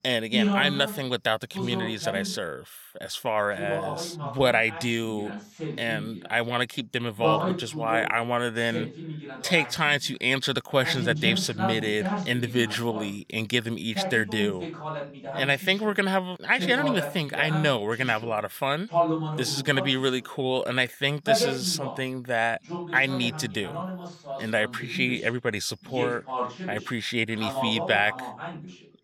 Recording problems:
voice in the background; loud; throughout; 6 dB below the speech

